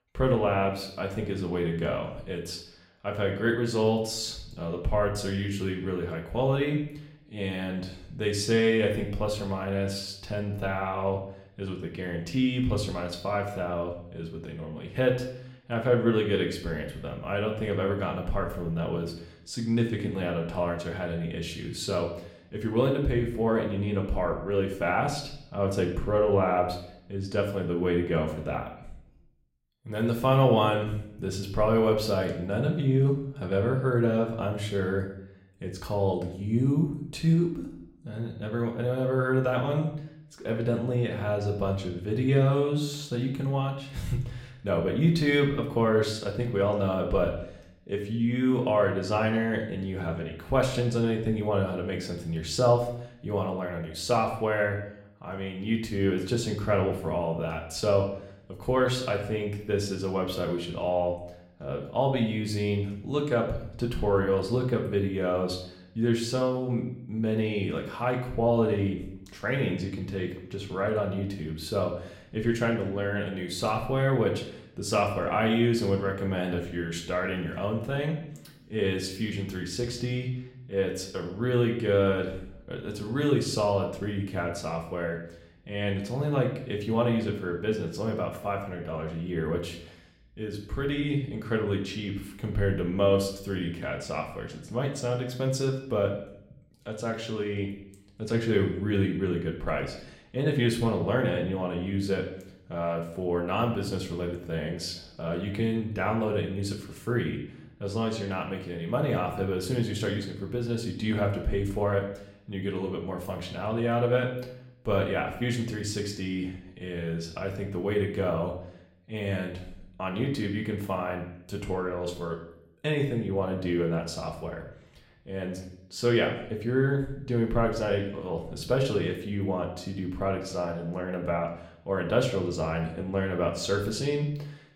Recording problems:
room echo; slight; dies away in 0.6 s
off-mic speech; somewhat distant

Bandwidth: 16 kHz